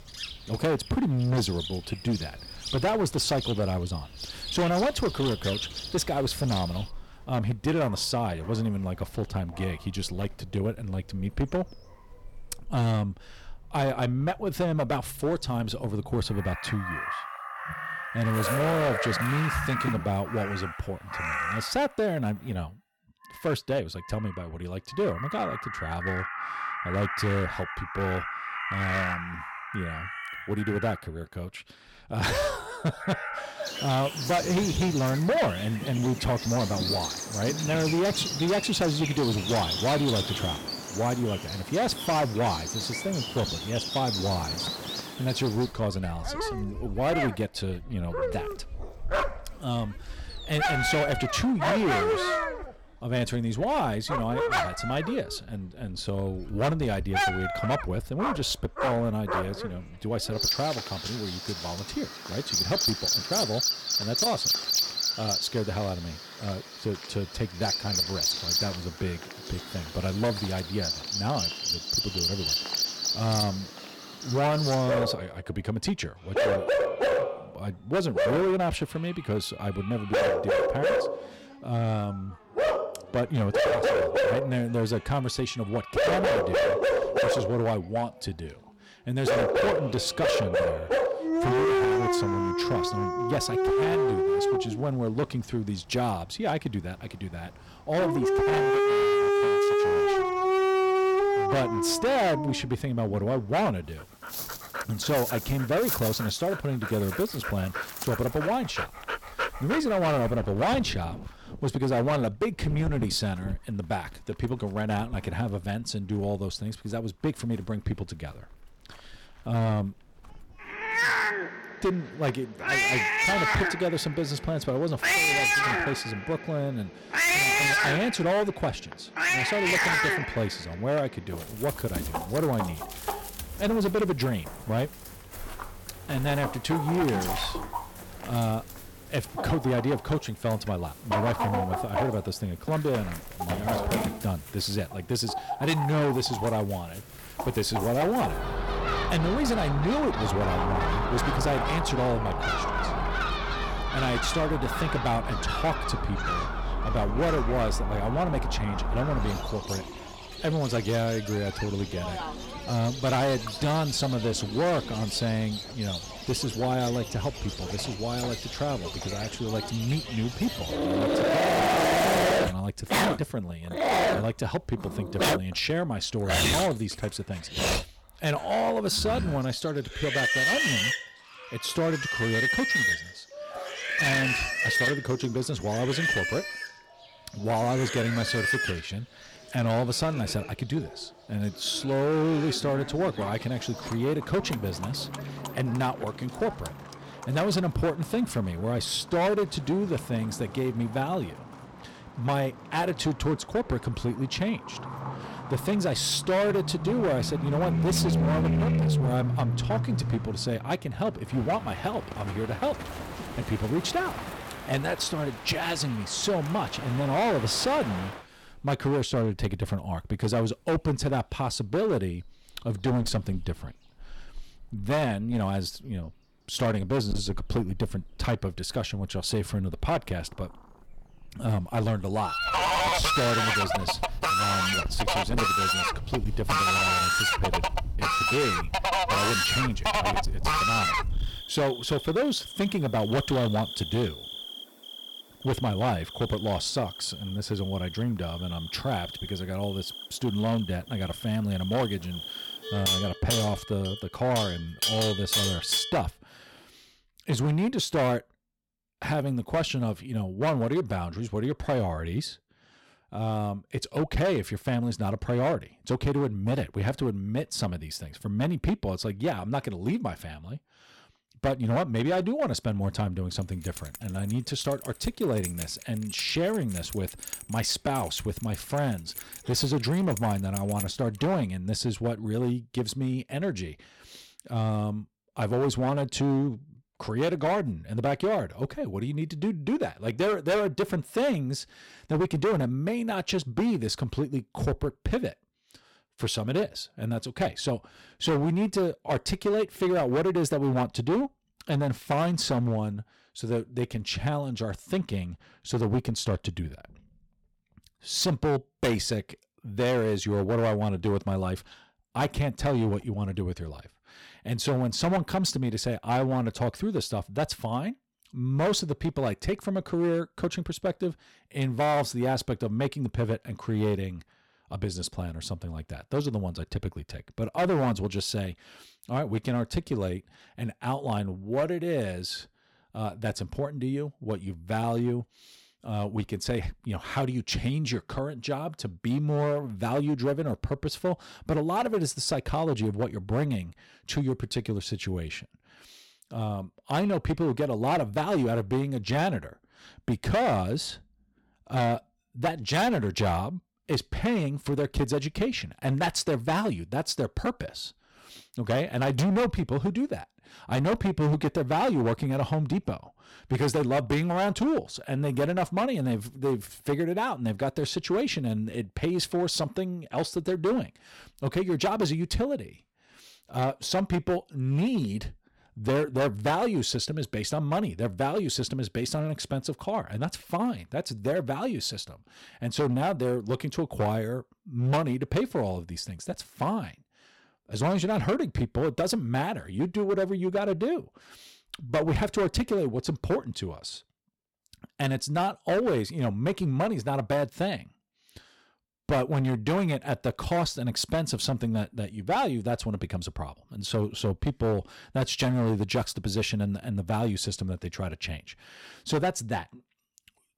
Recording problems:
distortion; heavy; 11% of the sound clipped
animal sounds; very loud; until 4:16; as loud as the speech
jangling keys; noticeable; from 4:34 to 4:41; peak 7 dB below the speech

